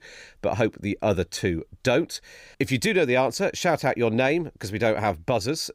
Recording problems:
none

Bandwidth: 15.5 kHz